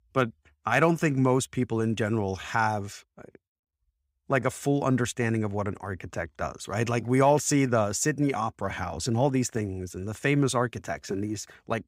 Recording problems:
none

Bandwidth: 15.5 kHz